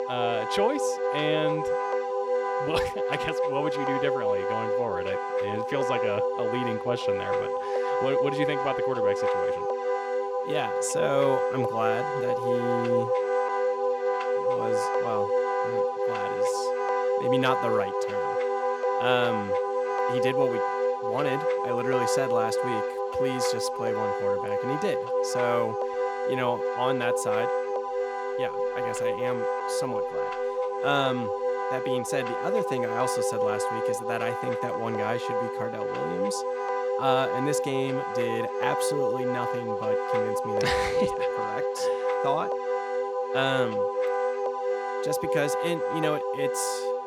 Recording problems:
background music; very loud; throughout; 4 dB above the speech

